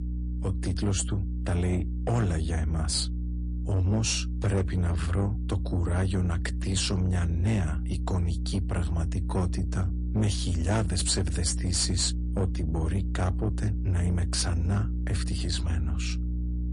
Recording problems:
distortion; slight; 10 dB below the speech
garbled, watery; slightly; nothing above 10.5 kHz
electrical hum; noticeable; throughout; 60 Hz, 10 dB below the speech

